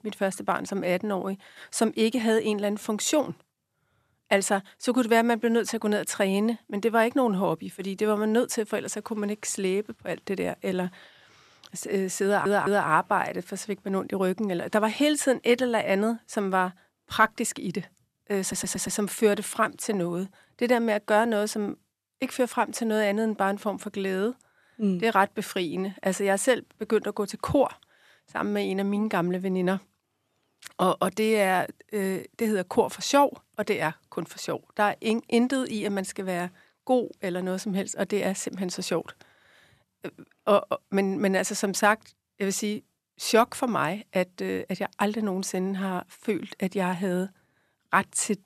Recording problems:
audio stuttering; at 12 s and at 18 s

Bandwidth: 13.5 kHz